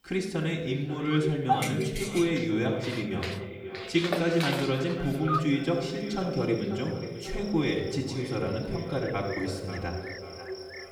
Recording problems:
echo of what is said; strong; throughout; 540 ms later, 10 dB below the speech
off-mic speech; far
room echo; slight; dies away in 1 s
animal sounds; loud; throughout; 8 dB below the speech

